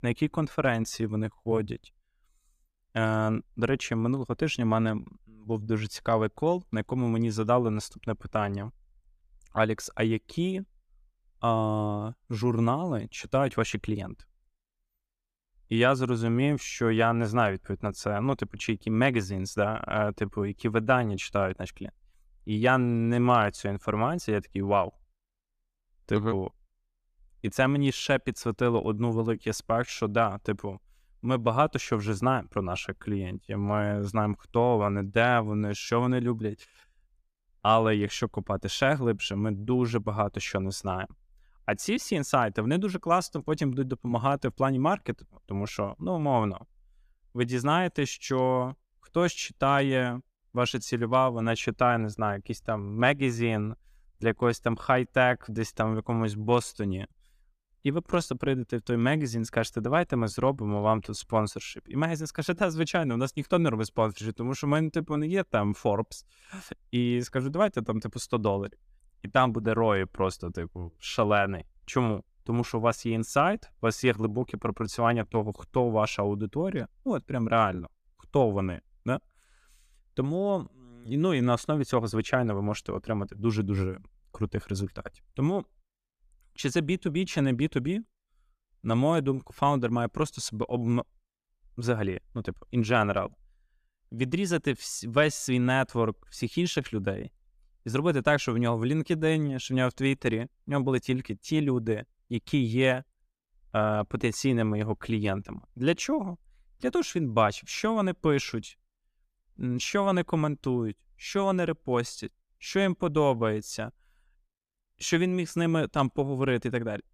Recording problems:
none

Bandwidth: 14.5 kHz